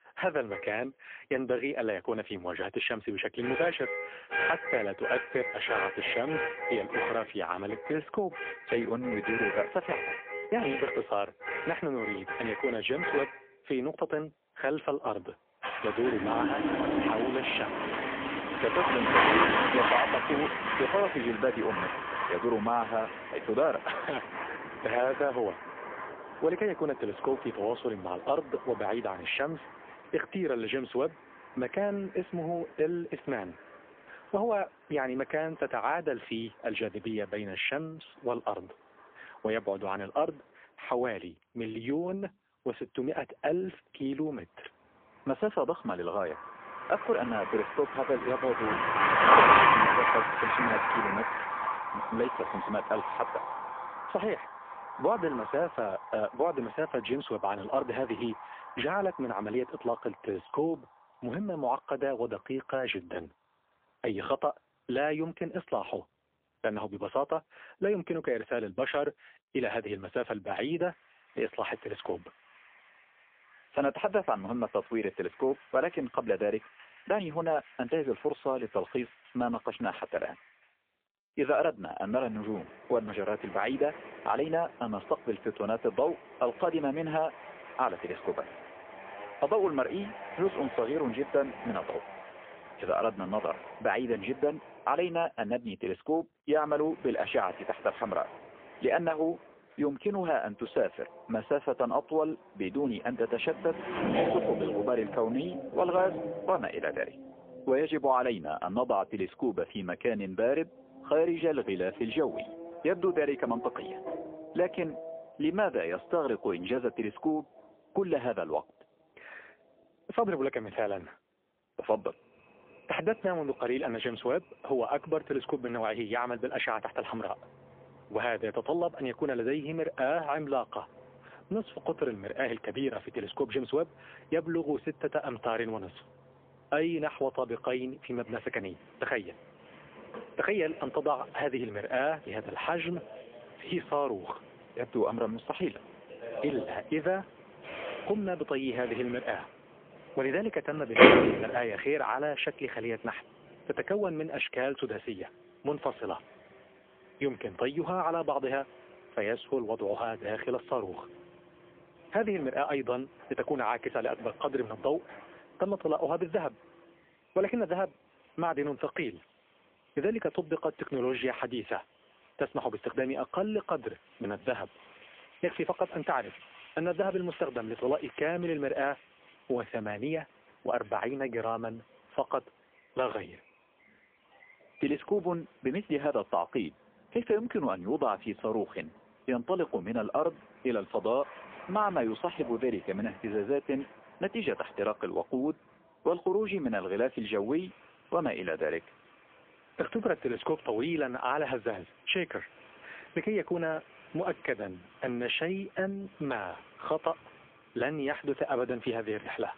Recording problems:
phone-call audio; poor line; nothing above 3.5 kHz
traffic noise; very loud; throughout; 1 dB above the speech

